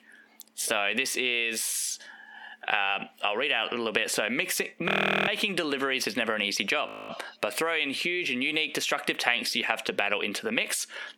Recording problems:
squashed, flat; heavily
thin; very slightly; fading below 300 Hz
audio freezing; at 5 s and at 7 s

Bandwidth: 18 kHz